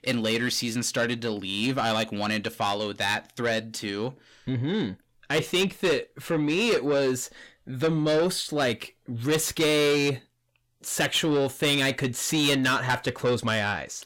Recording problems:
distortion; heavy; 8 dB below the speech

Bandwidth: 16.5 kHz